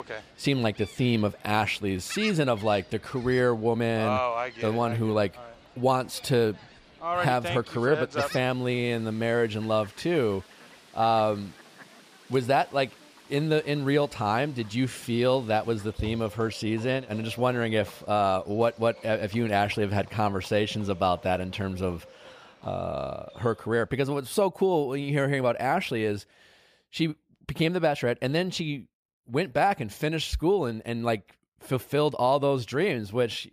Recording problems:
animal sounds; noticeable; until 24 s; 10 dB below the speech

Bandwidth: 15 kHz